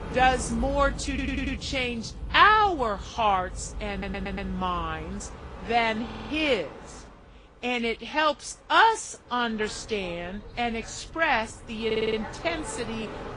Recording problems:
garbled, watery; slightly; nothing above 10 kHz
train or aircraft noise; noticeable; throughout; 15 dB below the speech
audio stuttering; 4 times, first at 1 s

